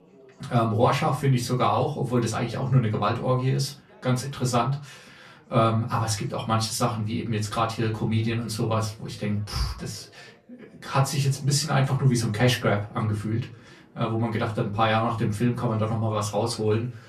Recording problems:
off-mic speech; far
room echo; very slight; dies away in 0.3 s
background chatter; faint; throughout; 4 voices, 30 dB below the speech

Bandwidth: 13.5 kHz